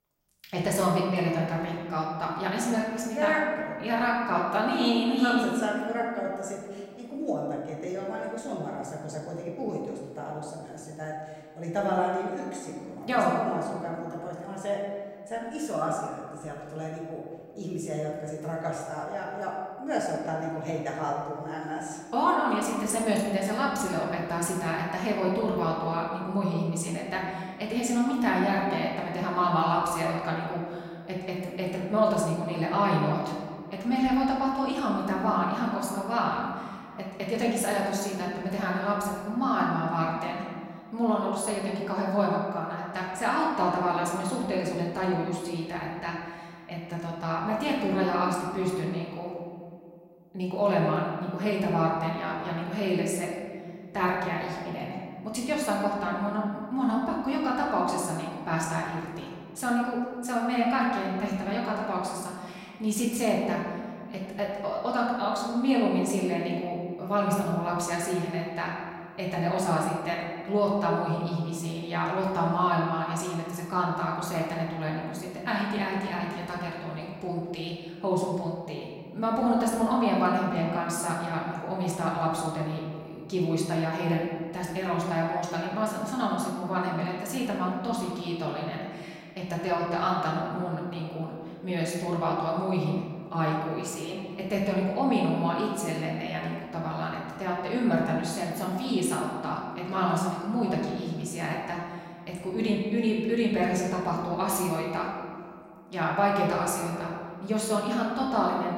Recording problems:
off-mic speech; far
room echo; noticeable; dies away in 1.7 s

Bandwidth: 16 kHz